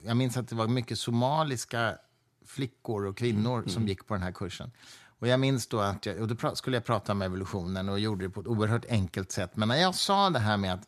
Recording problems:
none

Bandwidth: 13.5 kHz